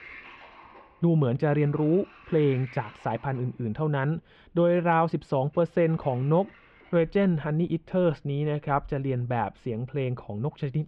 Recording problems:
muffled; very; fading above 3 kHz
household noises; faint; throughout; 25 dB below the speech

